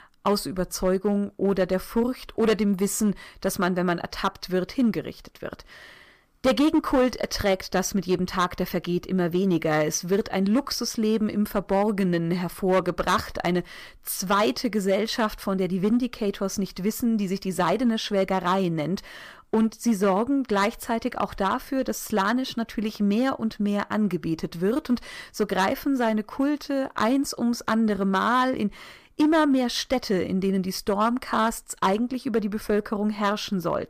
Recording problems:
distortion; slight; 4% of the sound clipped

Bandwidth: 15 kHz